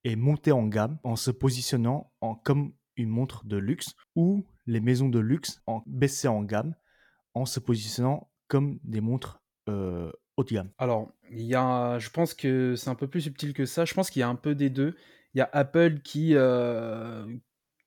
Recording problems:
none

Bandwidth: 18 kHz